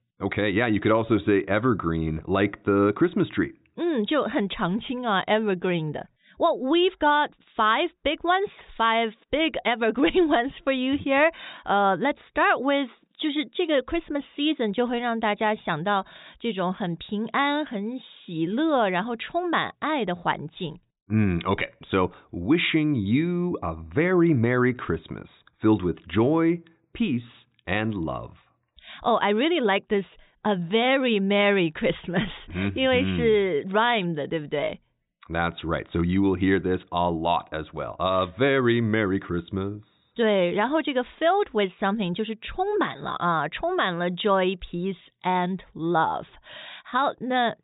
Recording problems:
high frequencies cut off; severe; nothing above 4 kHz

